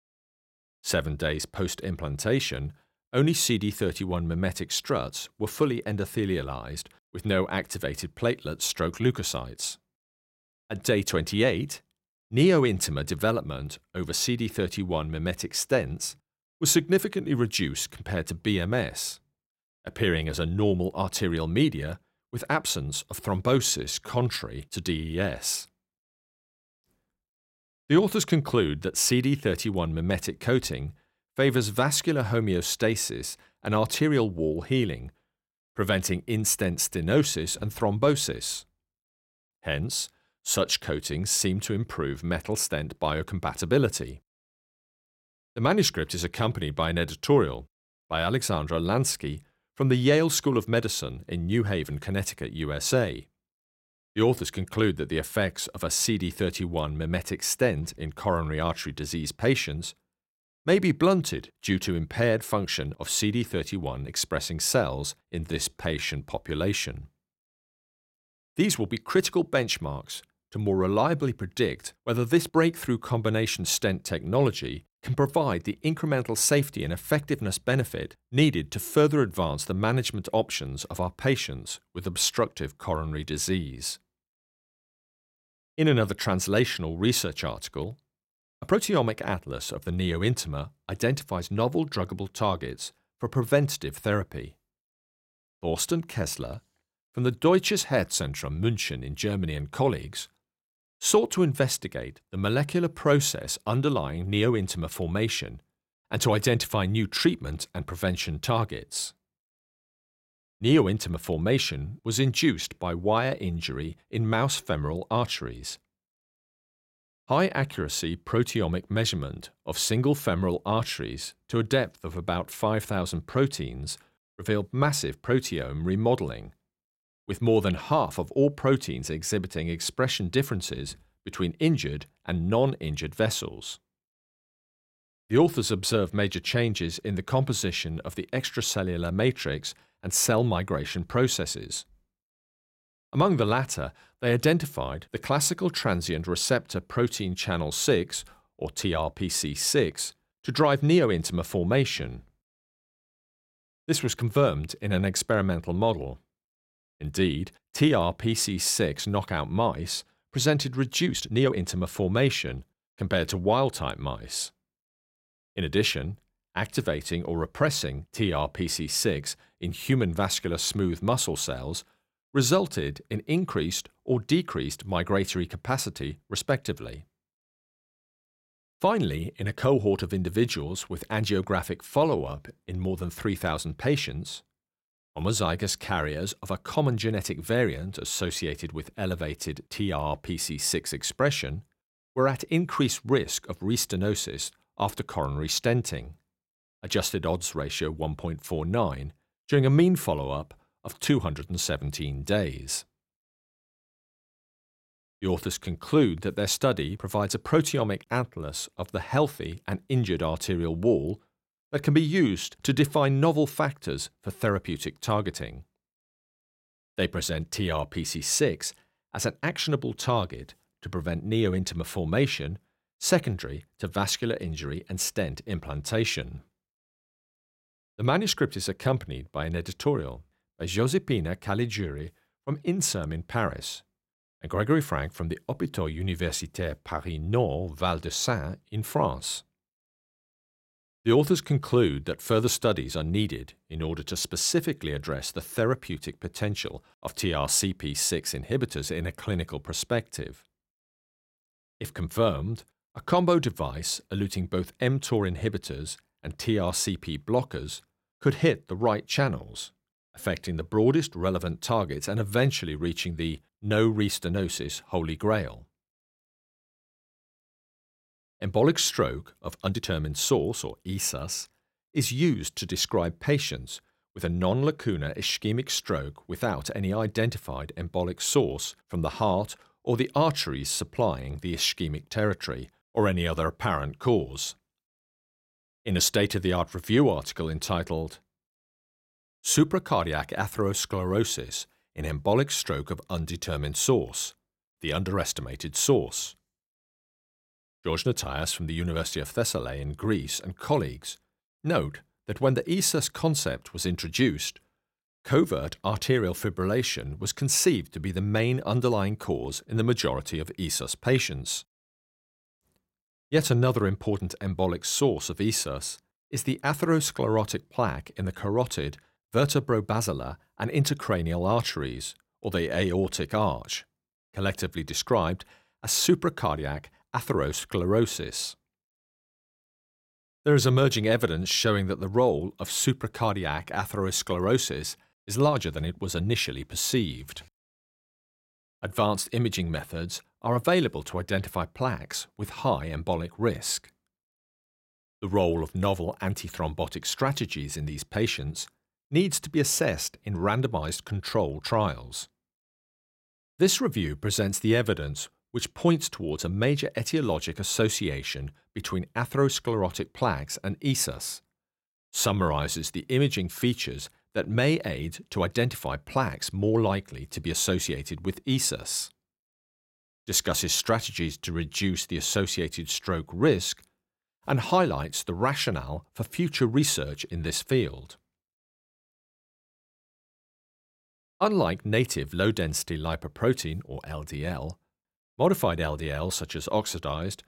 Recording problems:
uneven, jittery; strongly; from 24 s to 5:38

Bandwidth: 16 kHz